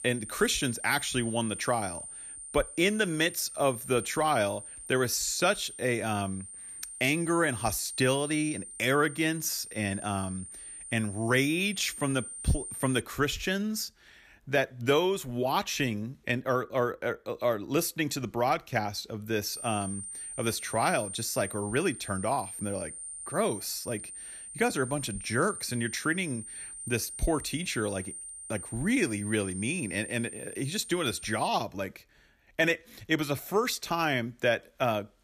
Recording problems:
high-pitched whine; loud; until 13 s and from 20 to 31 s; 9 kHz, 9 dB below the speech

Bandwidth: 14.5 kHz